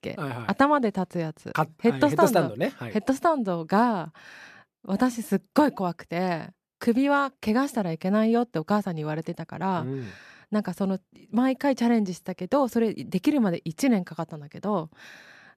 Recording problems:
none

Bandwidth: 14.5 kHz